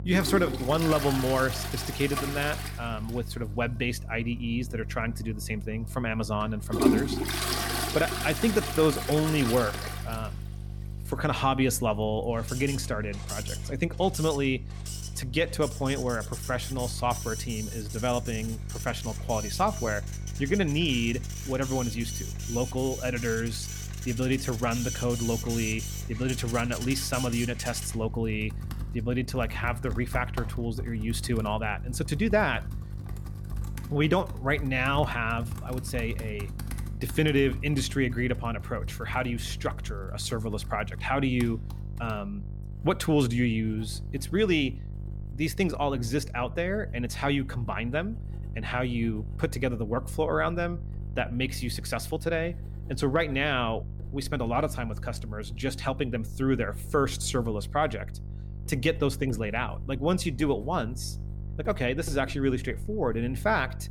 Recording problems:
household noises; loud; throughout; 8 dB below the speech
electrical hum; faint; throughout; 50 Hz, 20 dB below the speech

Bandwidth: 17.5 kHz